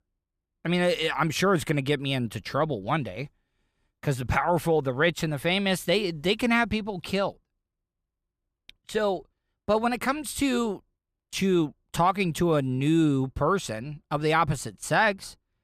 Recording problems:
none

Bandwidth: 14.5 kHz